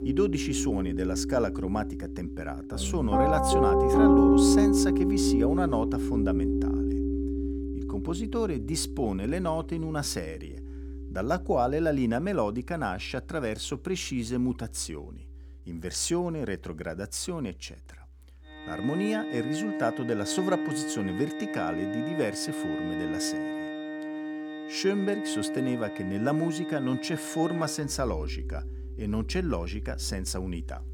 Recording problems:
background music; very loud; throughout; 1 dB above the speech

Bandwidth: 18 kHz